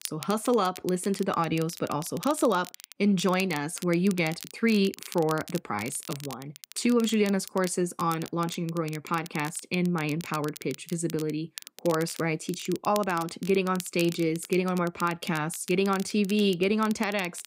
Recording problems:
crackle, like an old record; noticeable; 15 dB below the speech

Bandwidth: 15.5 kHz